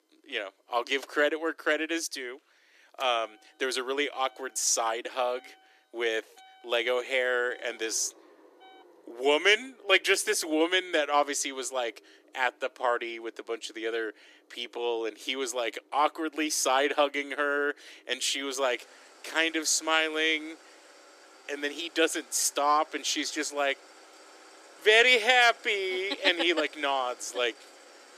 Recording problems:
thin; somewhat; fading below 300 Hz
traffic noise; faint; throughout; 25 dB below the speech

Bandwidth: 14.5 kHz